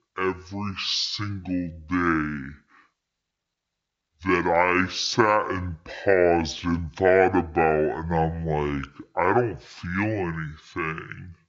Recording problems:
wrong speed and pitch; too slow and too low; 0.5 times normal speed

